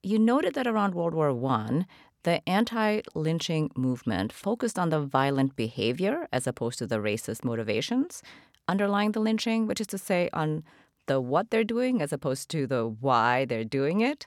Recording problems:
none

